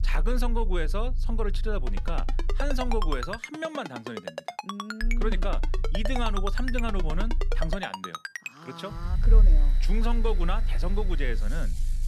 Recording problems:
machinery noise; noticeable; from 8.5 s on; 15 dB below the speech
low rumble; noticeable; until 3.5 s, from 5 to 8 s and from 9 s on; 20 dB below the speech
phone ringing; noticeable; from 2 to 8.5 s; peak 1 dB below the speech

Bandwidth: 14.5 kHz